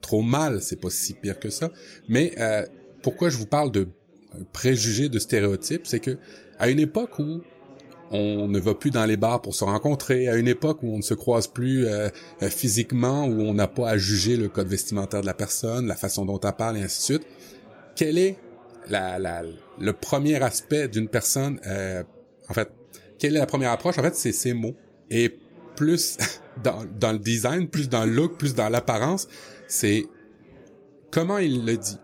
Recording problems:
chatter from many people; faint; throughout; 25 dB below the speech

